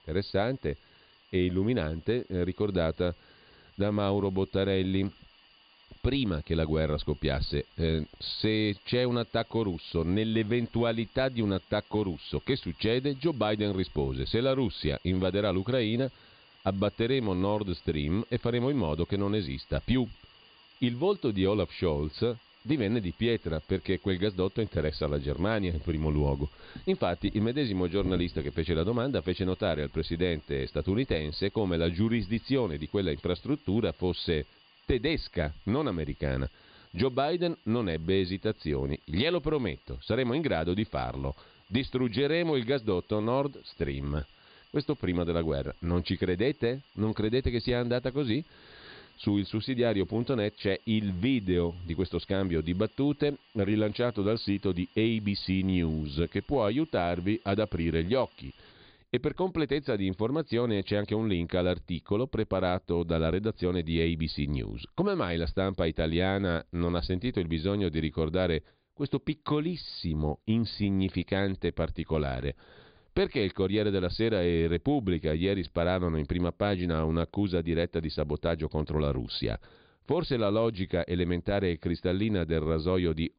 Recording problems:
high frequencies cut off; severe; nothing above 5 kHz
hiss; faint; until 59 s; 30 dB below the speech

